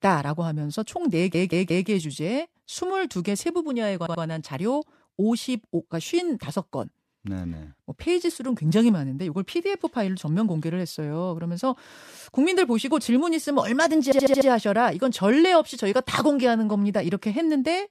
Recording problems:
audio stuttering; at 1 s, at 4 s and at 14 s

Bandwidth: 14 kHz